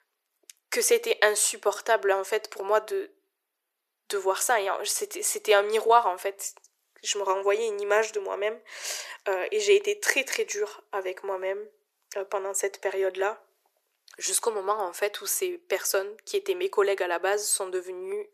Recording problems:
thin; very; fading below 400 Hz

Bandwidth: 14.5 kHz